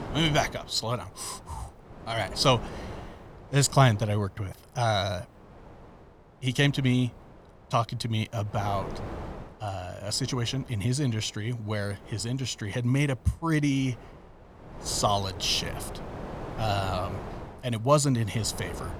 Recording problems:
wind noise on the microphone; occasional gusts; 15 dB below the speech

